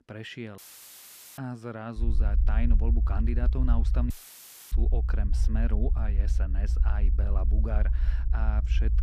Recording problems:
low rumble; loud; from 2 s on; 8 dB below the speech
audio cutting out; filled with static; at 0.5 s for 1 s and at 4 s for 0.5 s

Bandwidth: 14.5 kHz